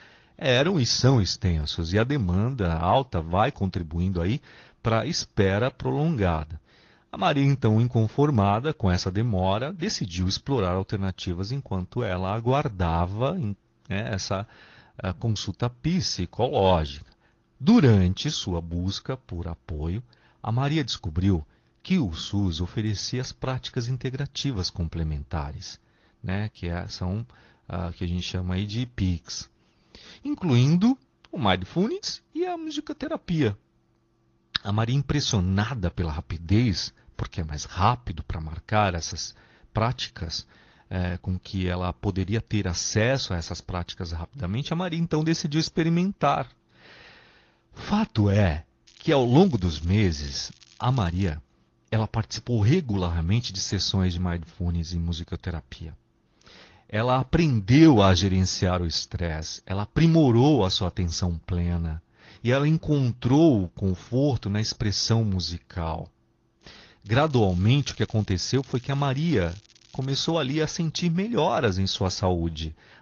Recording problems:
garbled, watery; slightly; nothing above 6.5 kHz
crackling; faint; from 49 to 51 s and from 1:07 to 1:10; 25 dB below the speech

